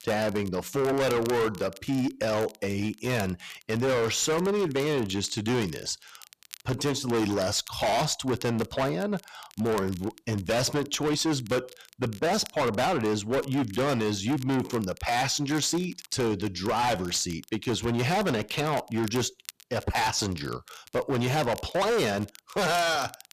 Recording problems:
distortion; heavy; 19% of the sound clipped
crackle, like an old record; faint; 20 dB below the speech

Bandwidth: 14.5 kHz